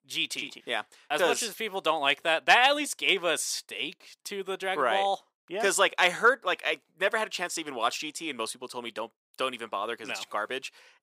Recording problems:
thin; somewhat; fading below 350 Hz

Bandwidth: 15.5 kHz